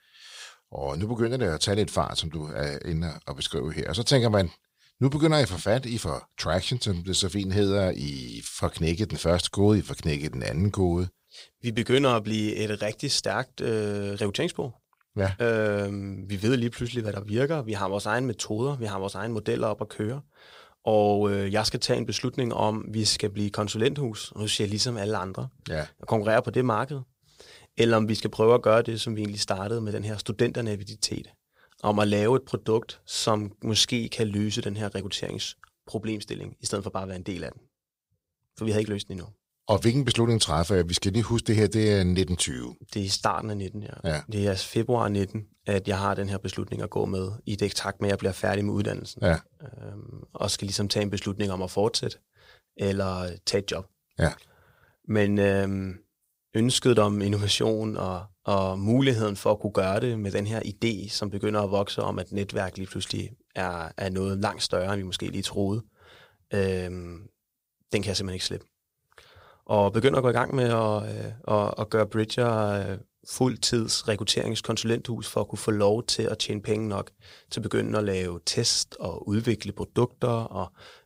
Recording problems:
none

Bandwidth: 15.5 kHz